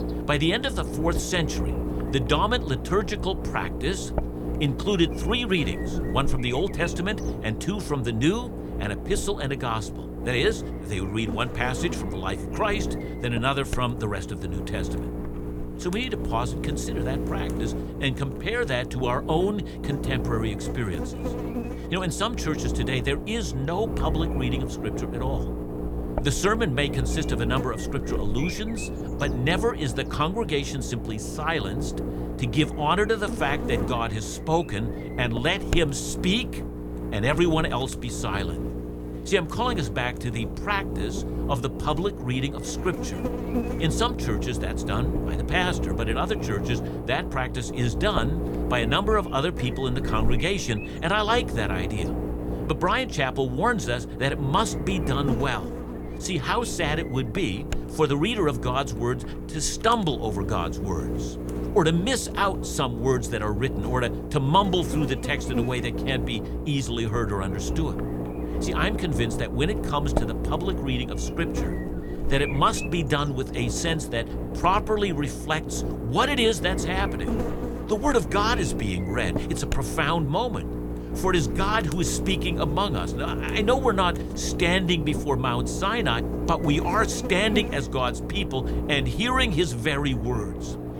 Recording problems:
electrical hum; loud; throughout; 60 Hz, 9 dB below the speech

